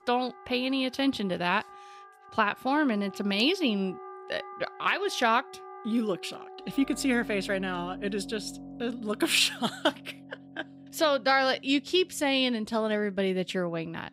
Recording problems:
background music; noticeable; throughout; 20 dB below the speech

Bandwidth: 15.5 kHz